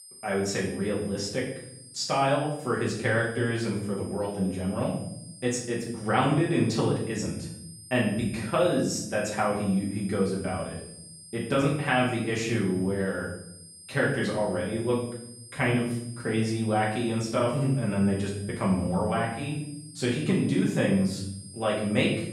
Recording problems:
off-mic speech; far
room echo; noticeable; dies away in 0.7 s
high-pitched whine; noticeable; throughout; 8.5 kHz, 20 dB below the speech

